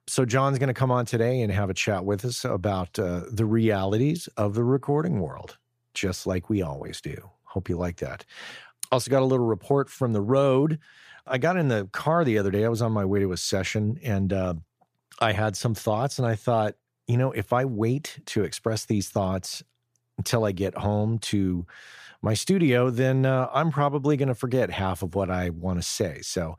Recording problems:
none

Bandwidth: 14.5 kHz